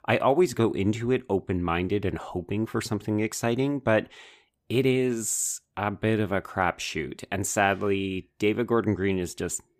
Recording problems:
none

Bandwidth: 15 kHz